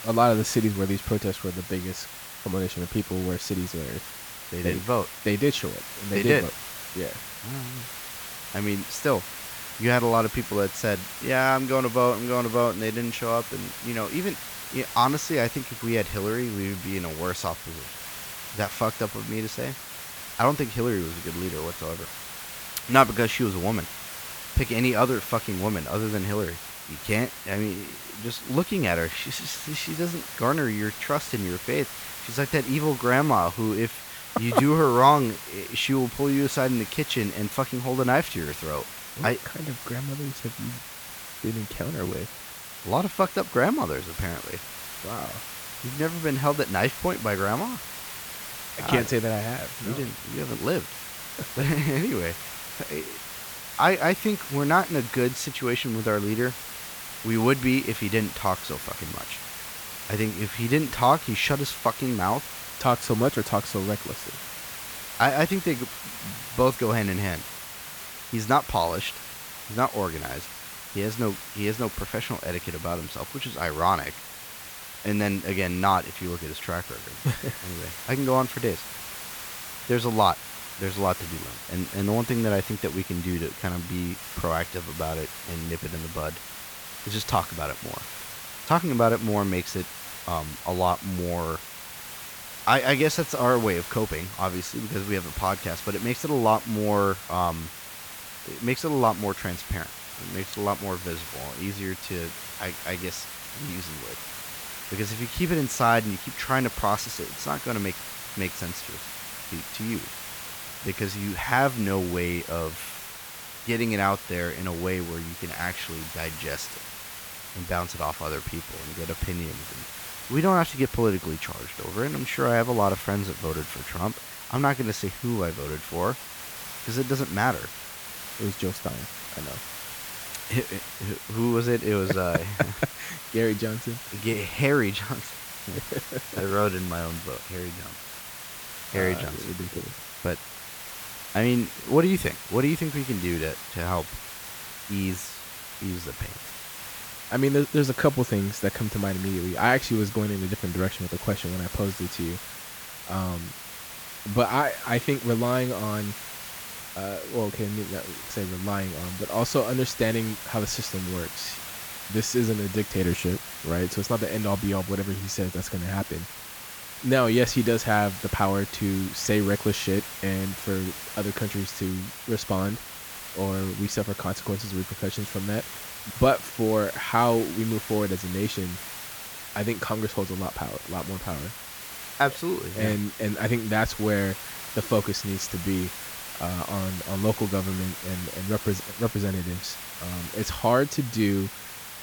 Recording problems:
hiss; loud; throughout; 9 dB below the speech

